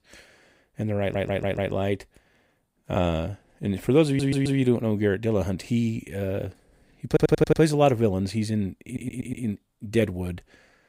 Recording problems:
audio stuttering; 4 times, first at 1 s

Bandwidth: 15.5 kHz